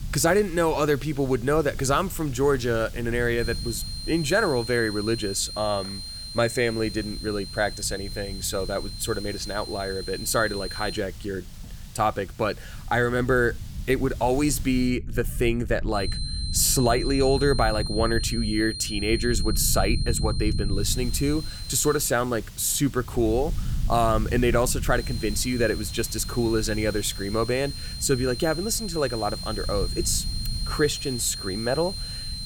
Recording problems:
high-pitched whine; loud; from 3.5 to 11 s, from 16 to 22 s and from 25 s on; 4 kHz, 9 dB below the speech
hiss; faint; until 15 s and from 21 s on; 20 dB below the speech
low rumble; faint; throughout; 25 dB below the speech

